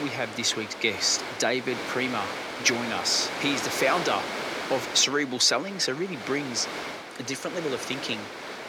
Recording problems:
thin; somewhat; fading below 350 Hz
wind noise on the microphone; heavy; 6 dB below the speech
abrupt cut into speech; at the start

